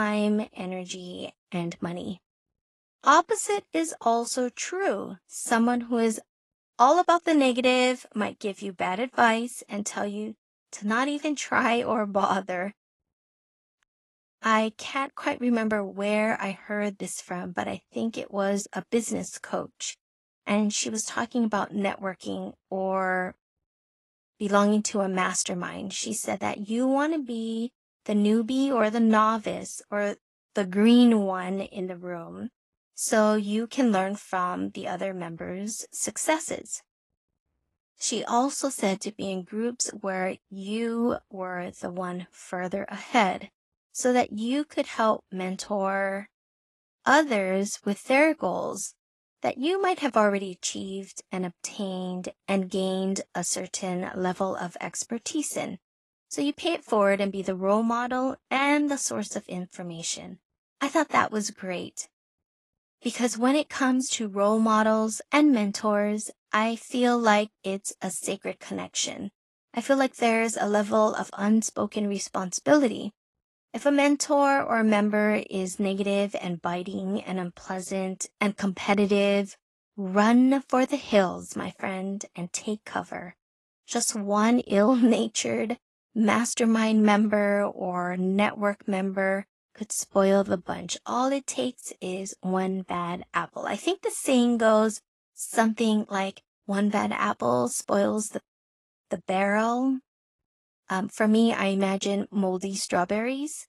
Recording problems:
garbled, watery; slightly; nothing above 11.5 kHz
abrupt cut into speech; at the start

